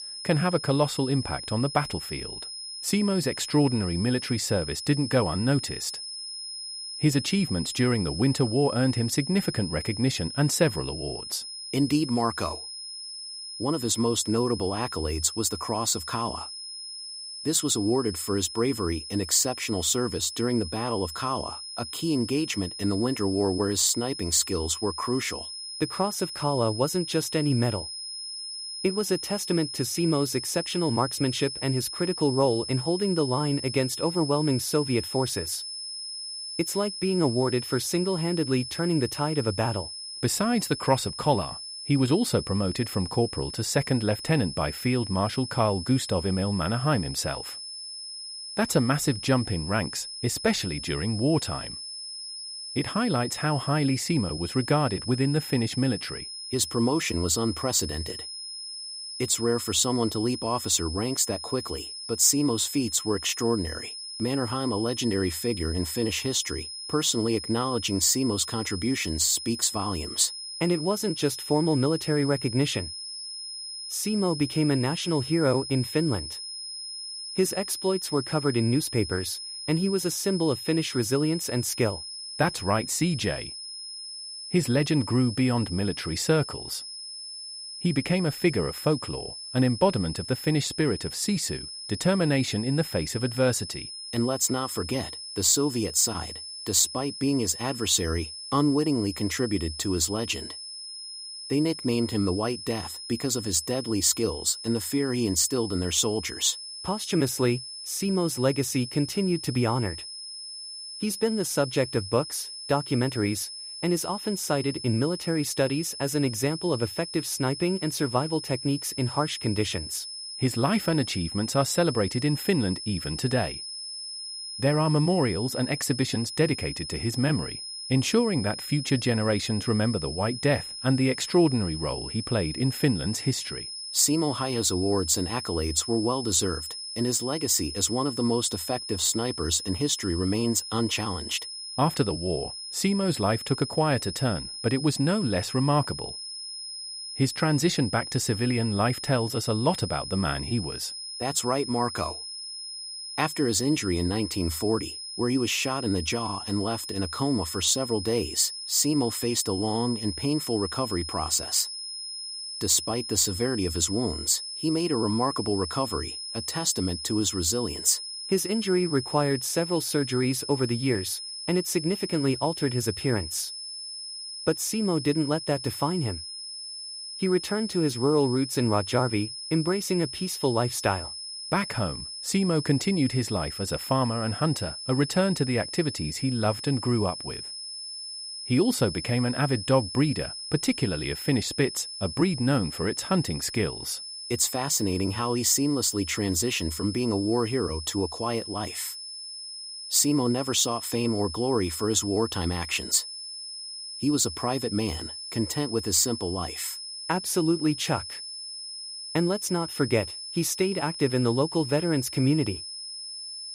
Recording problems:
high-pitched whine; loud; throughout; 5 kHz, 8 dB below the speech

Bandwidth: 15.5 kHz